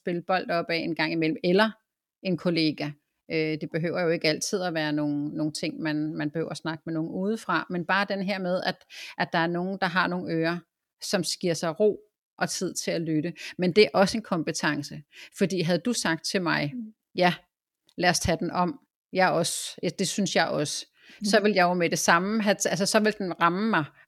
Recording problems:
none

